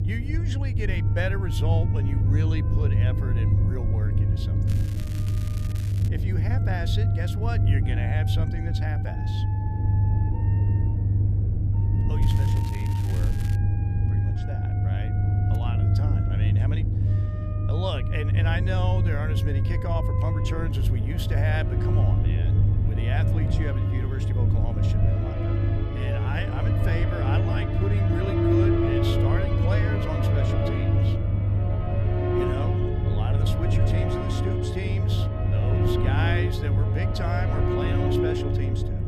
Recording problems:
background music; very loud; throughout; 3 dB above the speech
low rumble; loud; throughout; 3 dB below the speech
crackling; noticeable; from 4.5 to 6 s and from 12 to 14 s; 10 dB below the speech

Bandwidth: 14.5 kHz